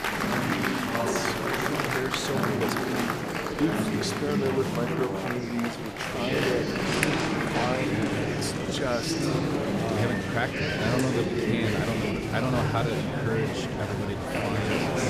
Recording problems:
murmuring crowd; very loud; throughout; 4 dB above the speech
wind noise on the microphone; occasional gusts; 20 dB below the speech

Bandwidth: 14.5 kHz